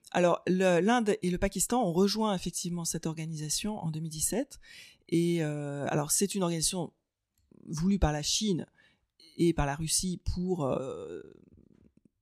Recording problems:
none

